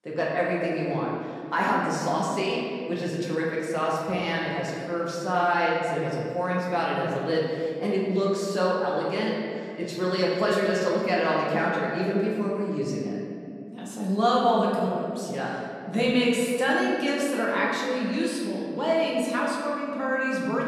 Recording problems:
off-mic speech; far
room echo; noticeable; dies away in 2.3 s

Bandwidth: 14.5 kHz